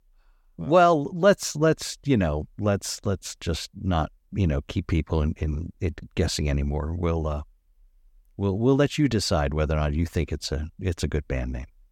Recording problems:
none

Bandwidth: 17.5 kHz